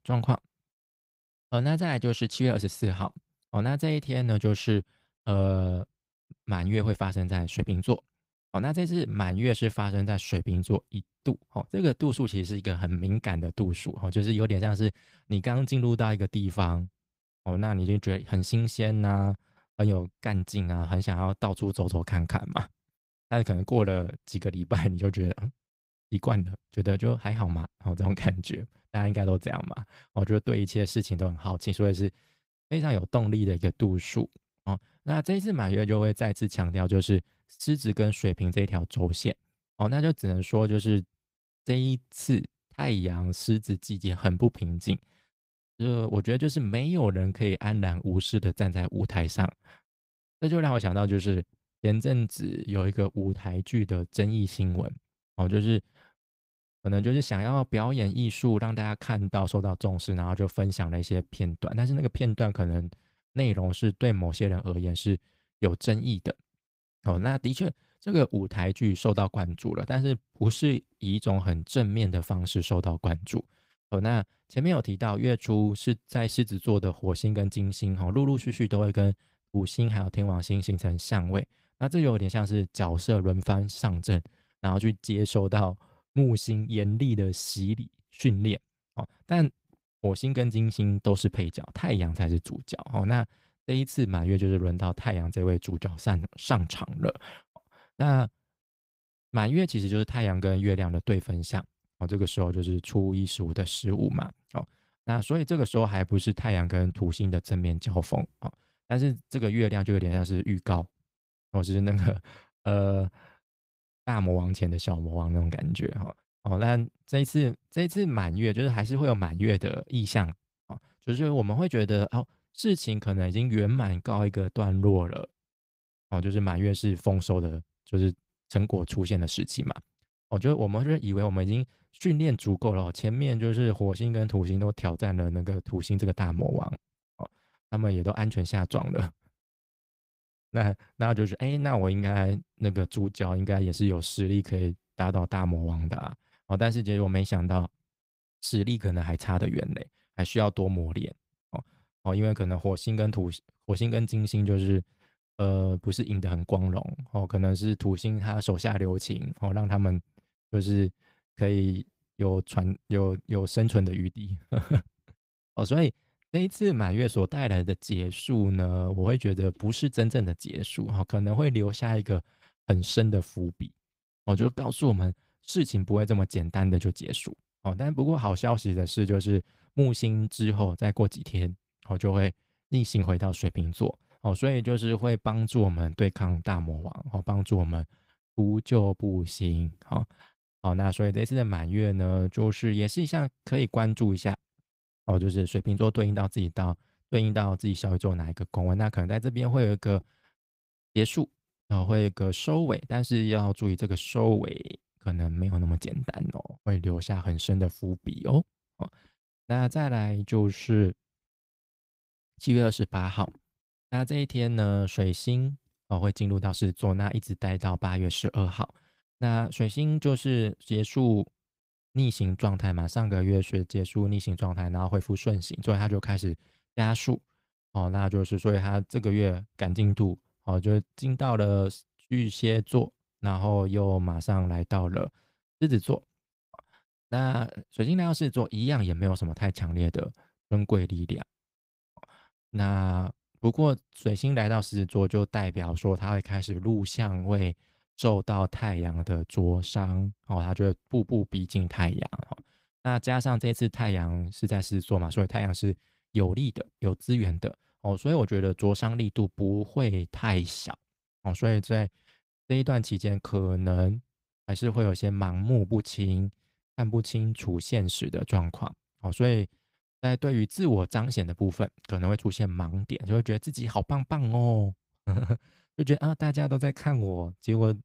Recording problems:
garbled, watery; slightly; nothing above 15.5 kHz

